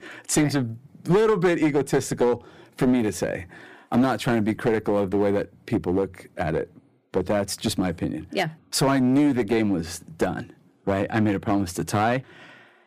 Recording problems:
distortion; slight; 6% of the sound clipped

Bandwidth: 15 kHz